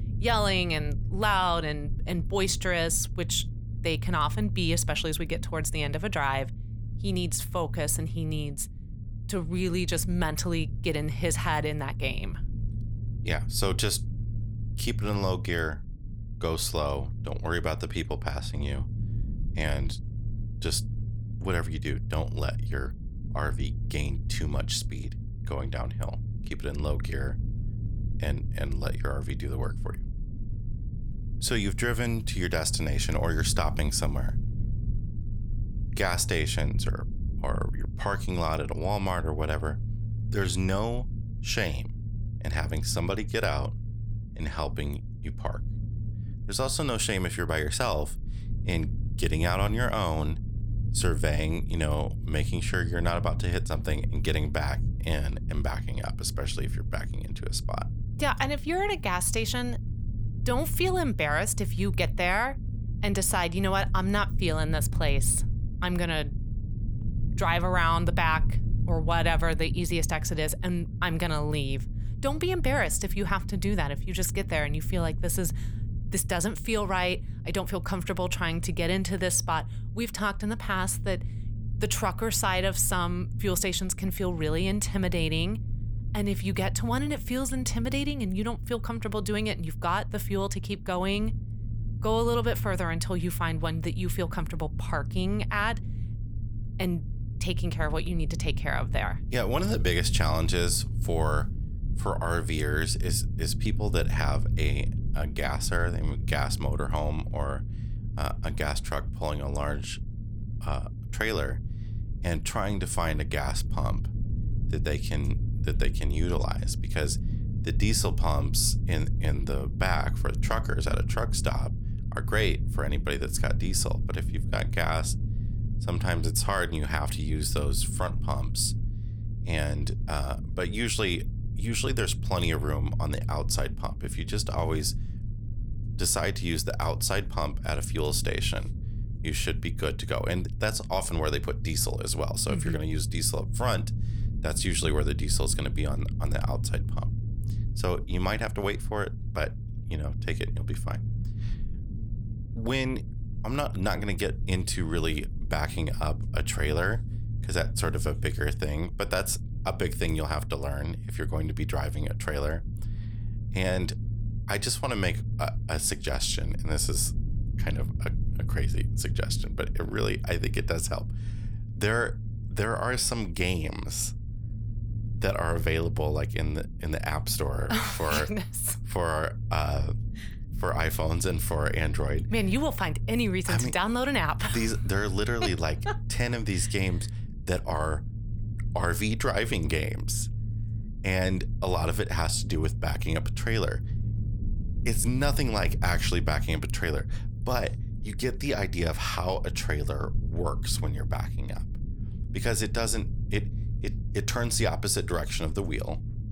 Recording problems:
low rumble; noticeable; throughout; 15 dB below the speech

